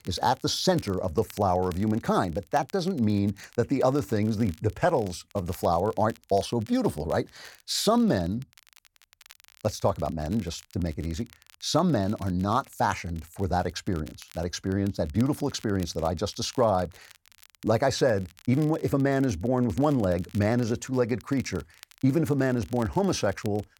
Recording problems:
crackle, like an old record; faint; 25 dB below the speech

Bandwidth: 17 kHz